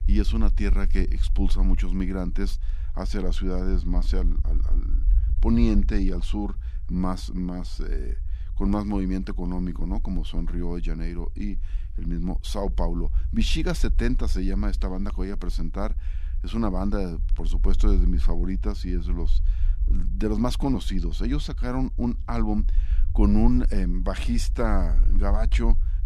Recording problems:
low rumble; noticeable; throughout; 20 dB below the speech

